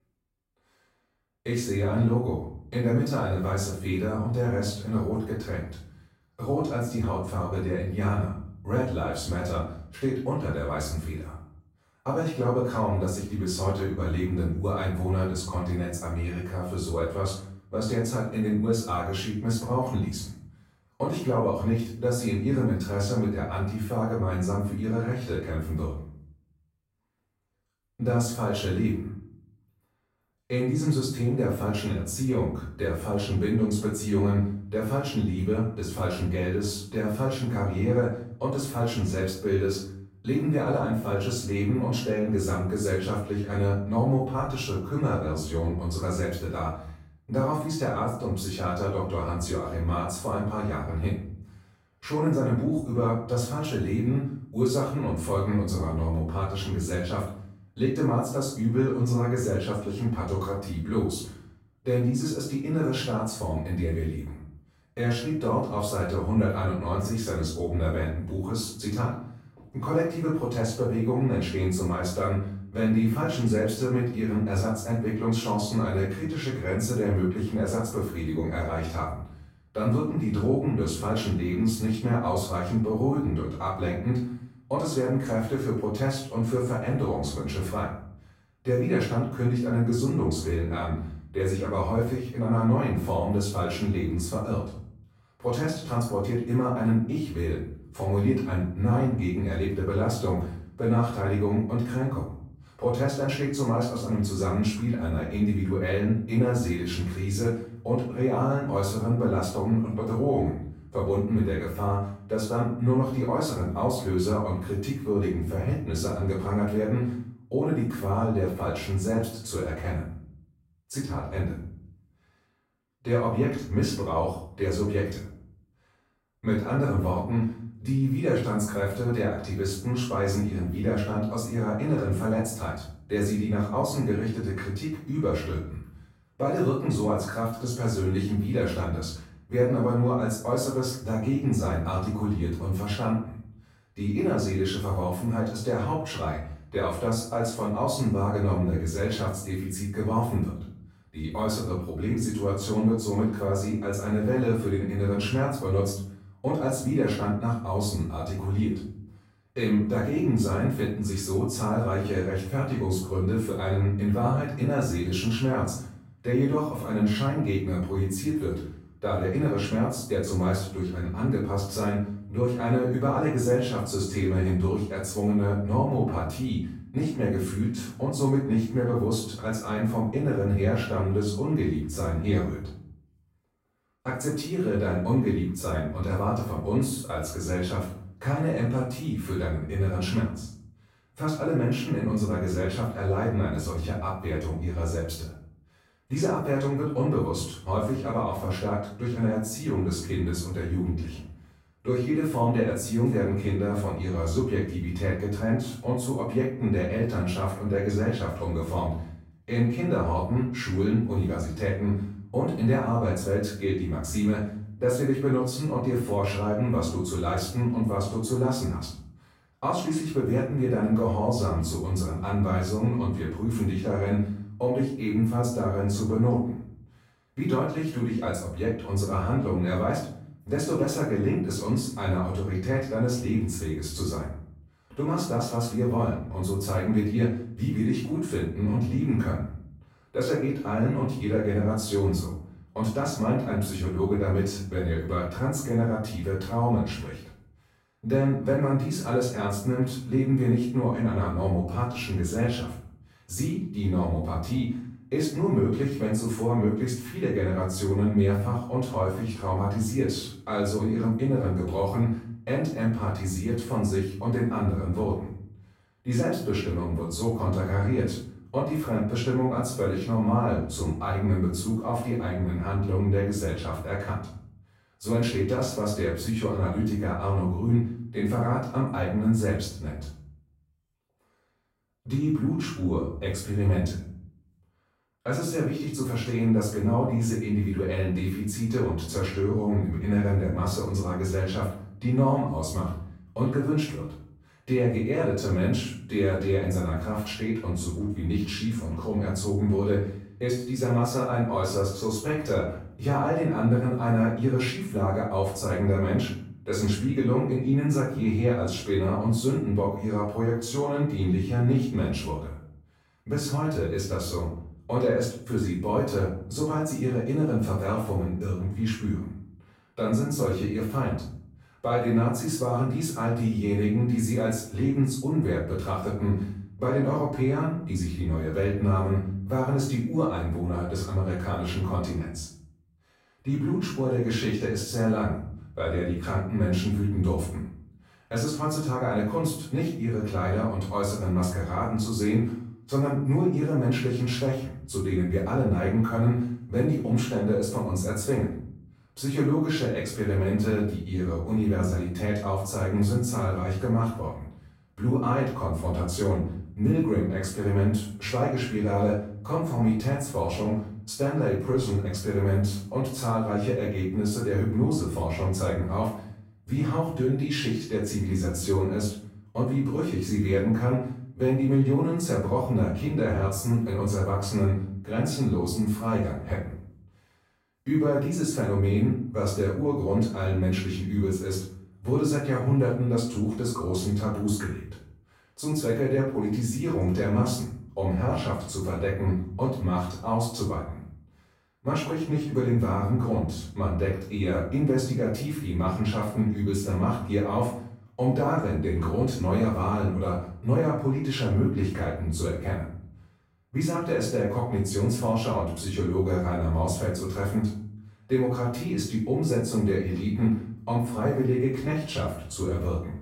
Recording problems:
off-mic speech; far
room echo; noticeable; dies away in 0.6 s

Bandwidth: 16 kHz